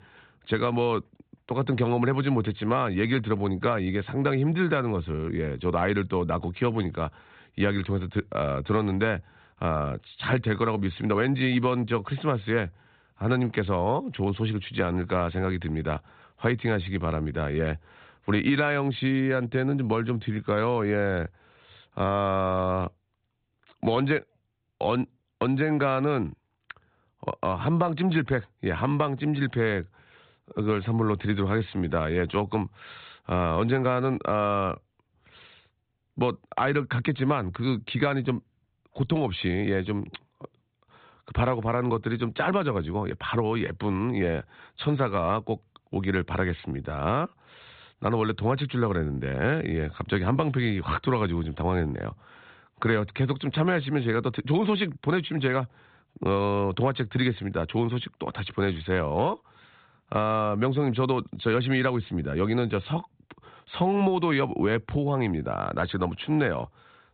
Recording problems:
high frequencies cut off; severe; nothing above 4 kHz

